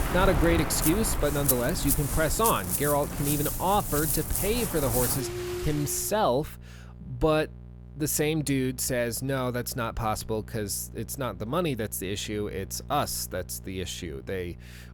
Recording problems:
rain or running water; loud; until 6 s; 1 dB below the speech
electrical hum; faint; throughout; 60 Hz, 25 dB below the speech

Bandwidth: 19 kHz